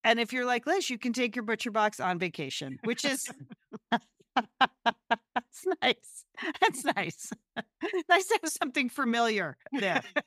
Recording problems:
none

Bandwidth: 15.5 kHz